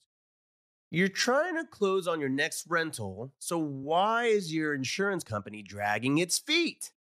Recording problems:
uneven, jittery; strongly; from 0.5 to 5.5 s

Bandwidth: 14.5 kHz